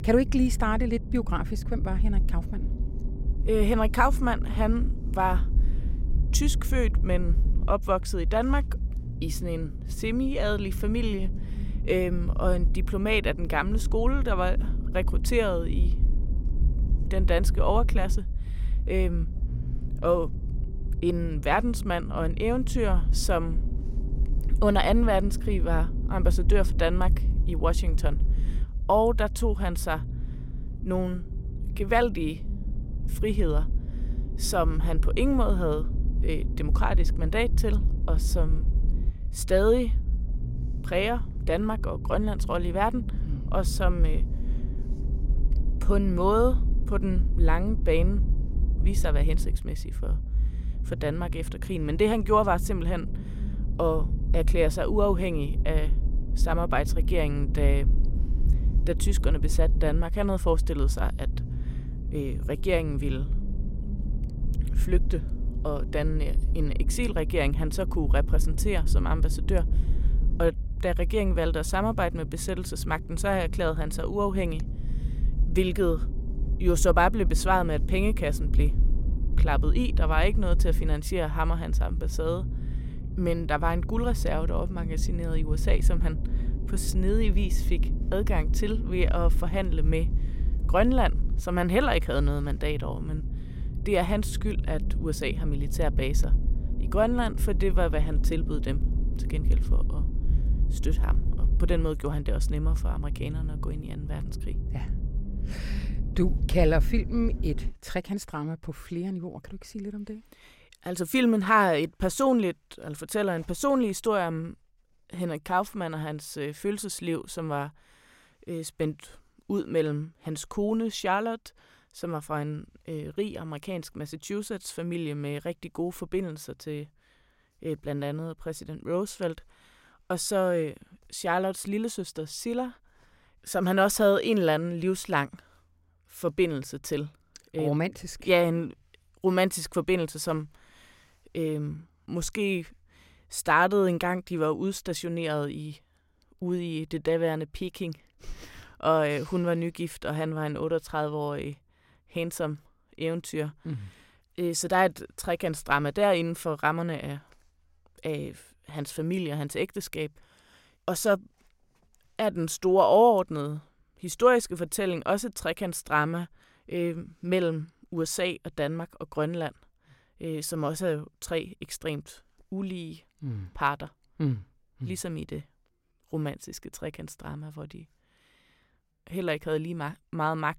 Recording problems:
low rumble; noticeable; until 1:48; 15 dB below the speech

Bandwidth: 16 kHz